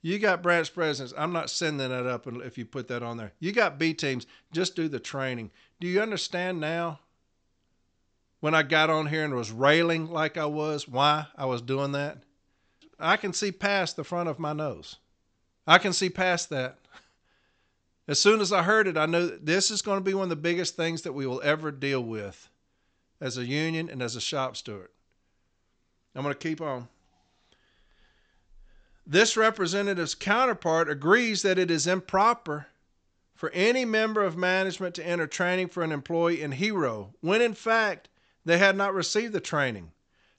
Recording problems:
high frequencies cut off; noticeable; nothing above 8 kHz

